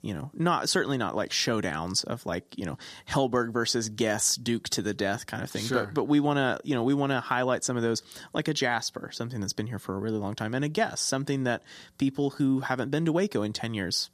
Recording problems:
none

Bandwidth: 14 kHz